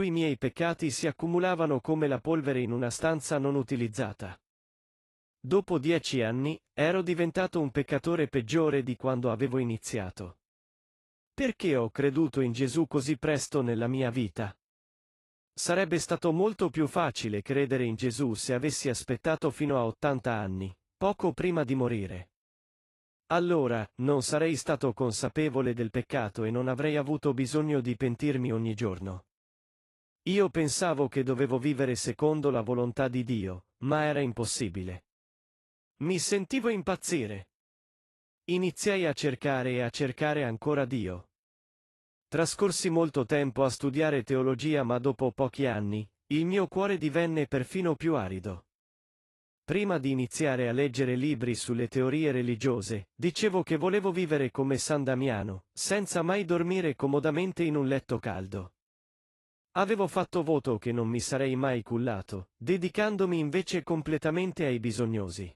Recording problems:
garbled, watery; slightly; nothing above 11.5 kHz
abrupt cut into speech; at the start

